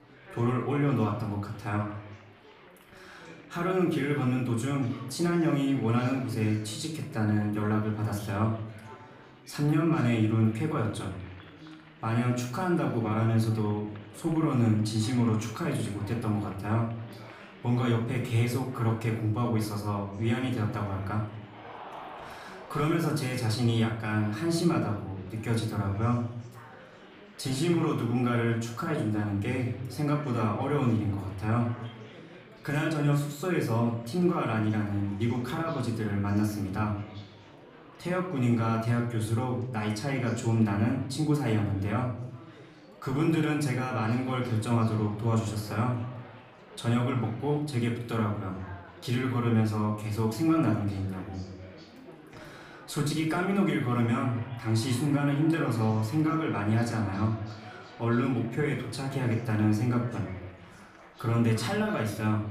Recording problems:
off-mic speech; far
room echo; noticeable; dies away in 0.5 s
chatter from many people; noticeable; throughout; 20 dB below the speech

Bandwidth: 15 kHz